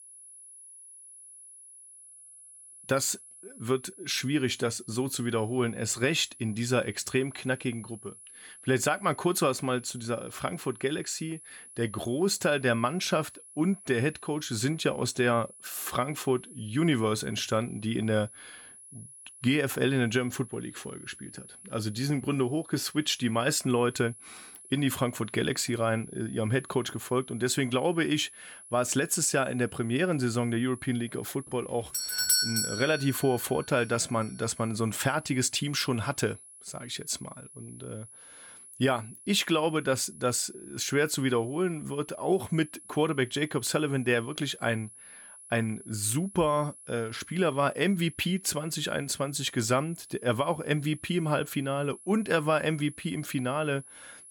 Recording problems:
high-pitched whine; noticeable; throughout; 10.5 kHz, 20 dB below the speech
doorbell; loud; at 32 s; peak 6 dB above the speech

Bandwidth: 17.5 kHz